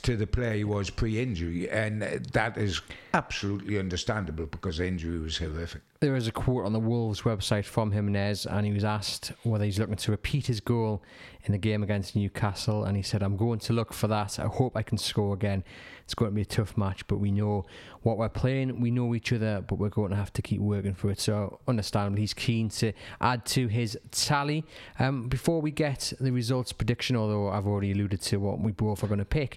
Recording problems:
squashed, flat; heavily

